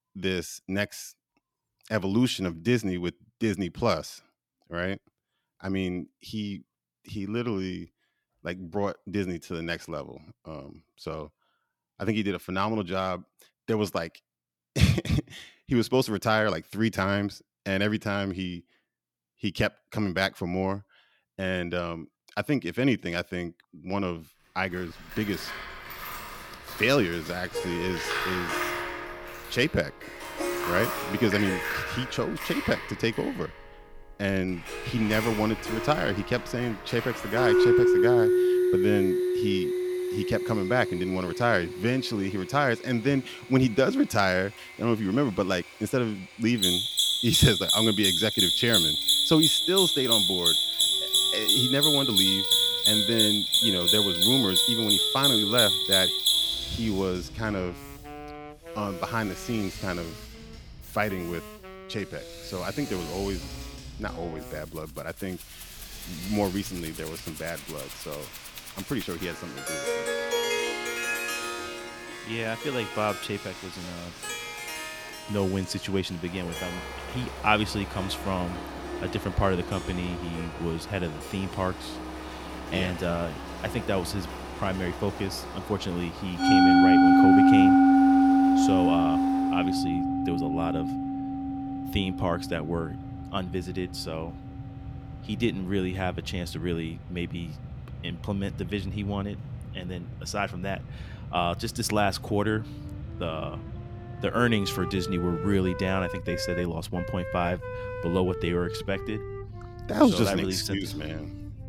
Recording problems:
machinery noise; very loud; from 25 s on; 2 dB above the speech
background music; very loud; from 27 s on; 3 dB above the speech

